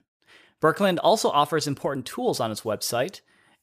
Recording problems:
none

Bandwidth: 15 kHz